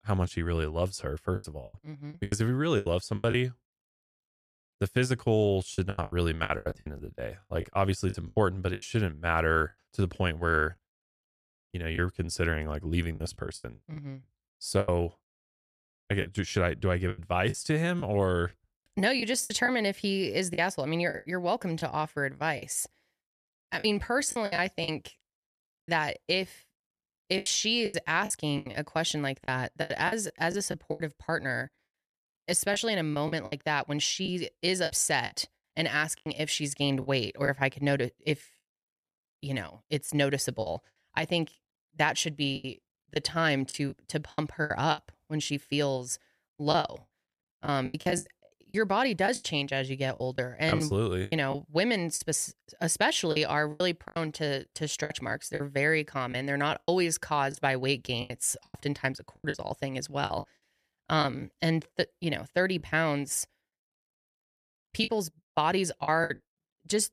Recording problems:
choppy; very; 11% of the speech affected

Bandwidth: 14.5 kHz